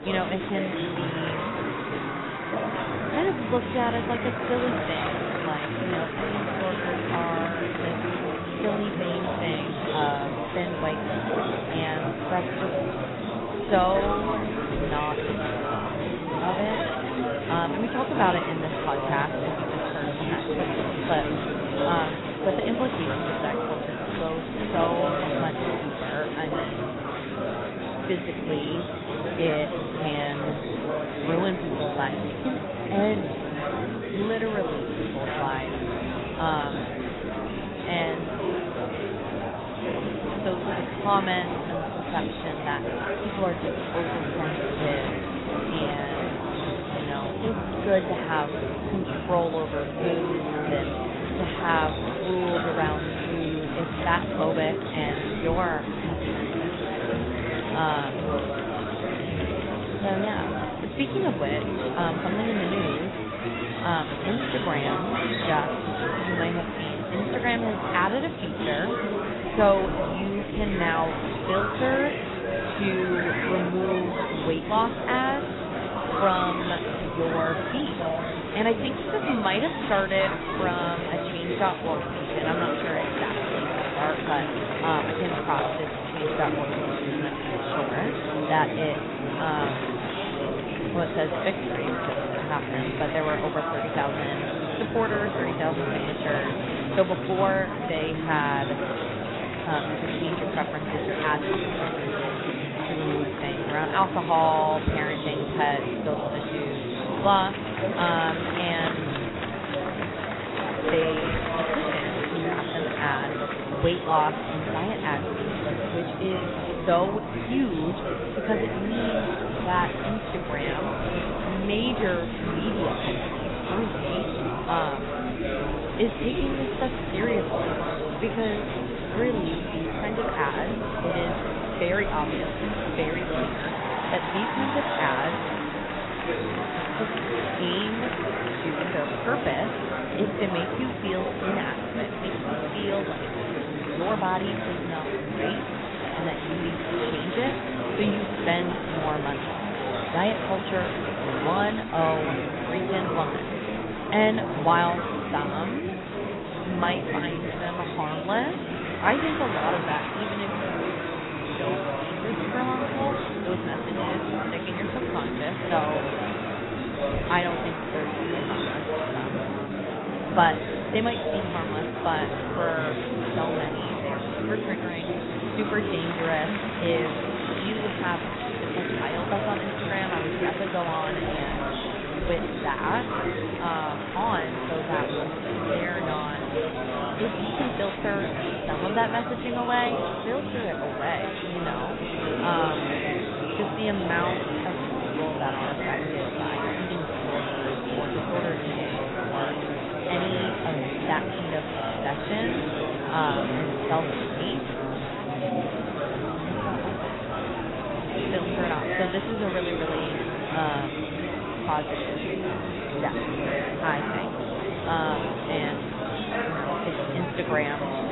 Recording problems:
garbled, watery; badly; nothing above 4 kHz
murmuring crowd; very loud; throughout; as loud as the speech

